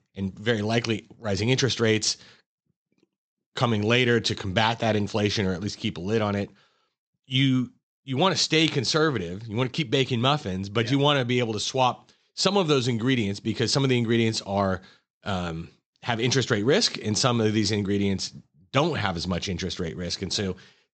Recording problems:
high frequencies cut off; noticeable; nothing above 8 kHz

